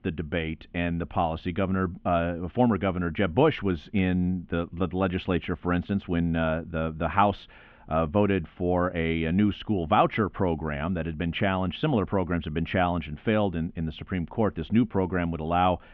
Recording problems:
muffled; very; fading above 3 kHz

